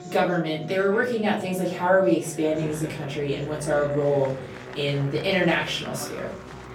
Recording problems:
off-mic speech; far
room echo; slight; dies away in 0.4 s
background music; noticeable; throughout; 20 dB below the speech
chatter from many people; noticeable; throughout; 15 dB below the speech

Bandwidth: 17 kHz